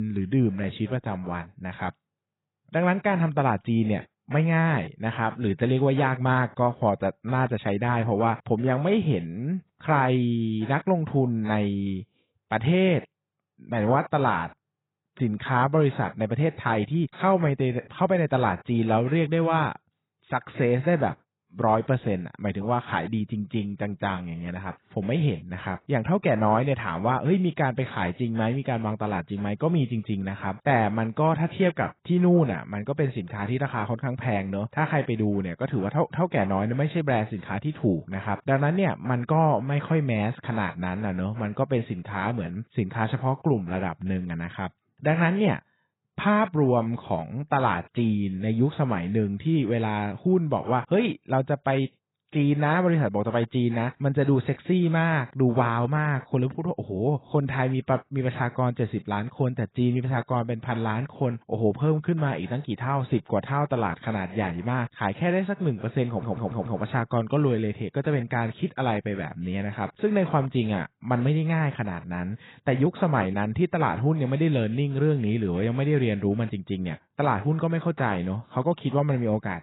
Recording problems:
garbled, watery; badly; nothing above 4 kHz
abrupt cut into speech; at the start
audio stuttering; at 1:06

